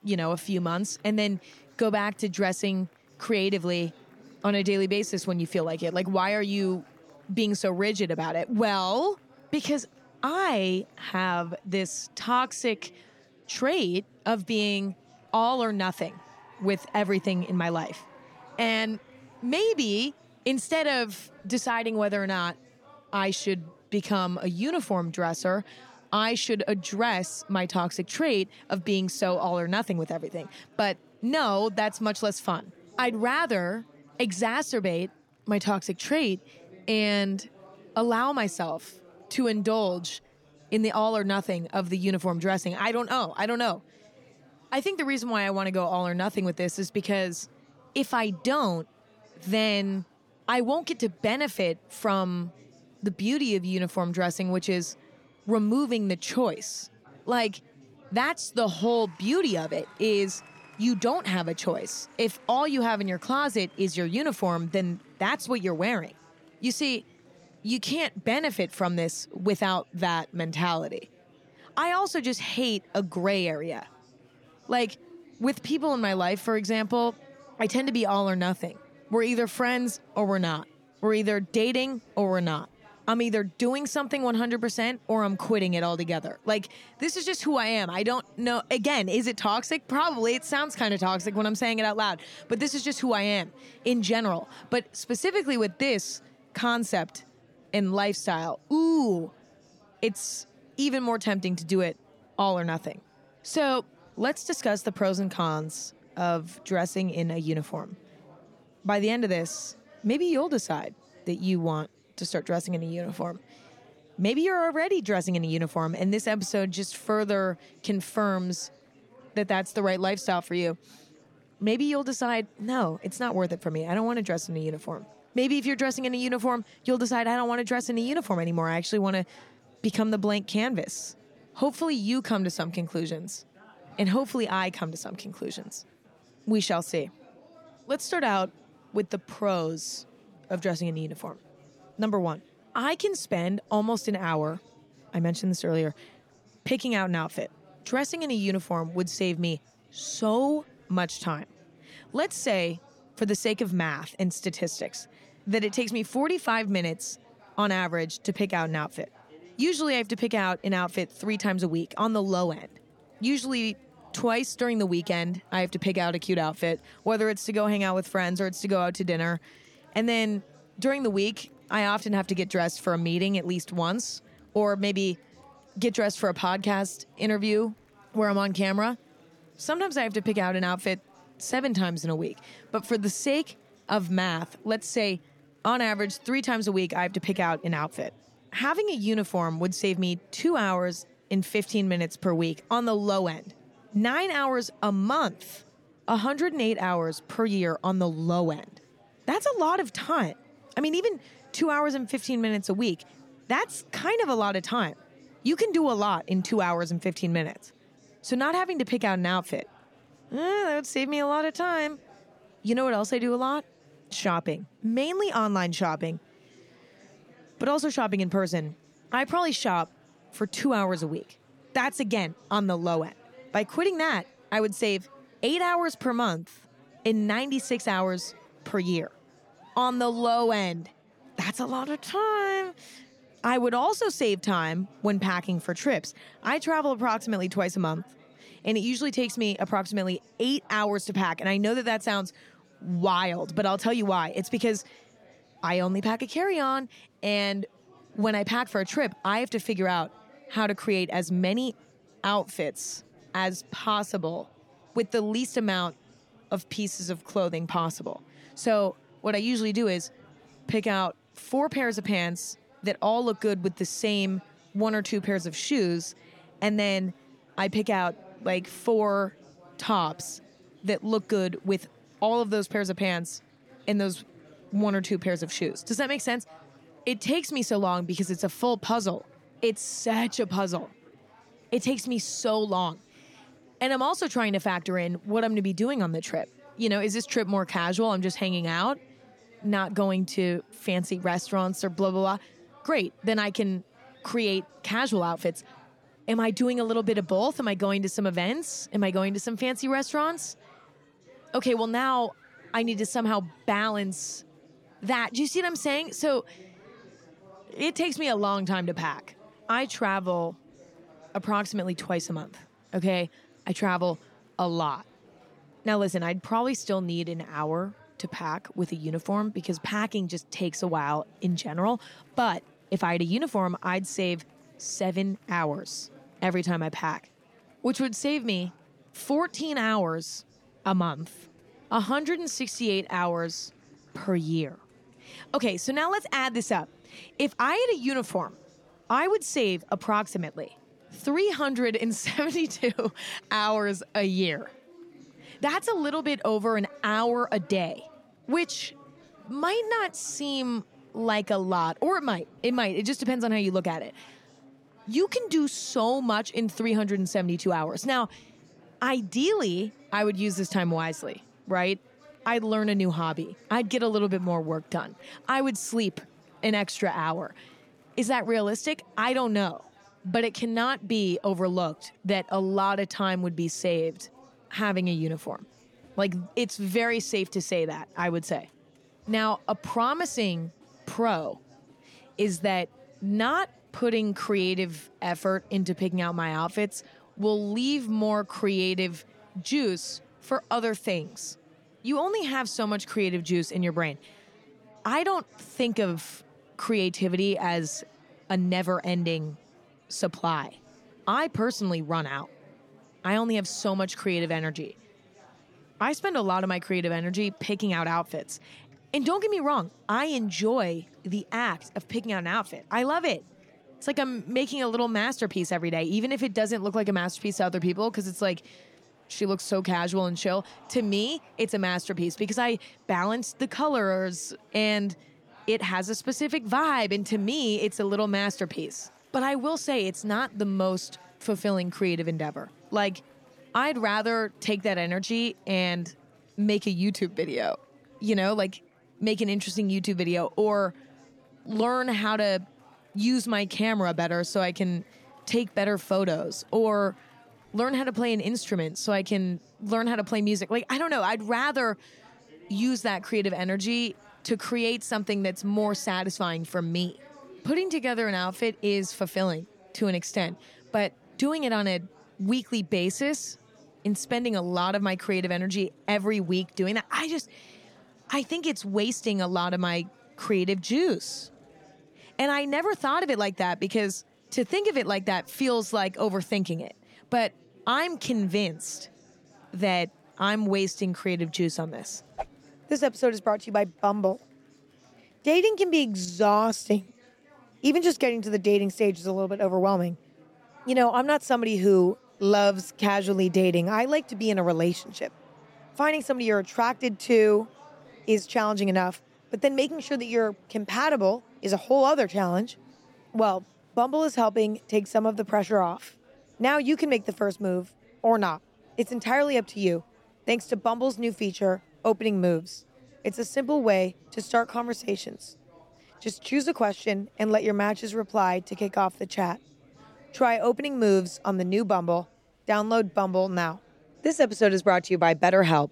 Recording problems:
murmuring crowd; faint; throughout; 30 dB below the speech

